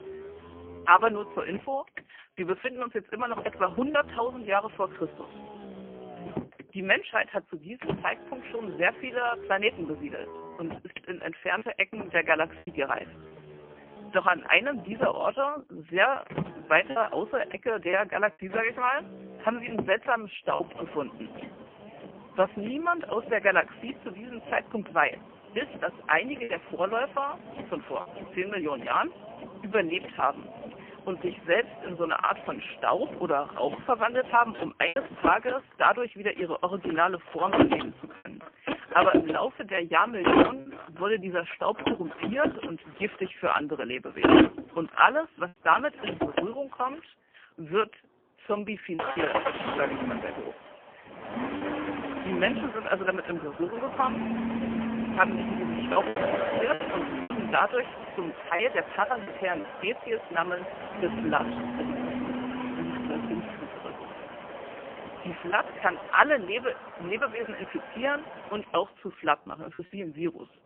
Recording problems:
phone-call audio; poor line; nothing above 3 kHz
traffic noise; loud; throughout; 5 dB below the speech
choppy; occasionally; 2% of the speech affected

